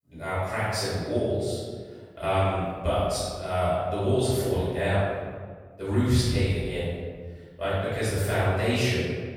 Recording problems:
room echo; strong; dies away in 1.5 s
off-mic speech; far

